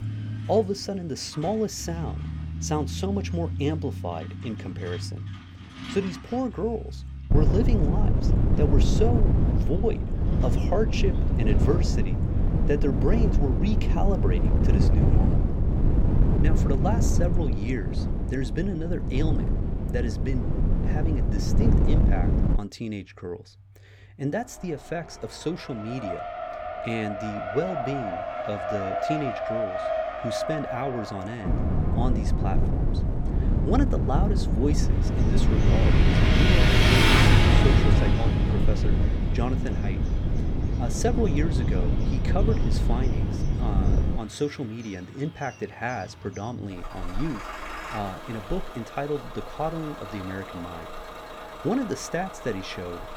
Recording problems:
traffic noise; very loud; throughout; as loud as the speech
wind noise on the microphone; heavy; from 7.5 to 23 s and from 31 to 44 s; 2 dB below the speech

